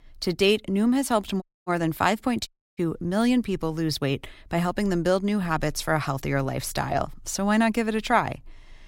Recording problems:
audio cutting out; at 1.5 s and at 2.5 s

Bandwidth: 16 kHz